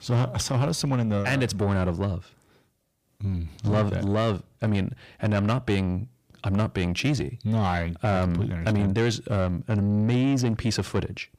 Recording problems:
distortion; slight; 10 dB below the speech

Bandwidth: 15 kHz